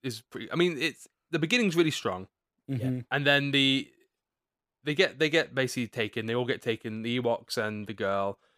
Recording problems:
none

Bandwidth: 15 kHz